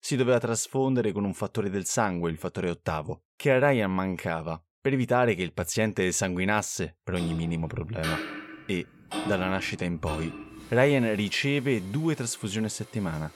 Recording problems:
household noises; noticeable; from 7.5 s on; 10 dB below the speech

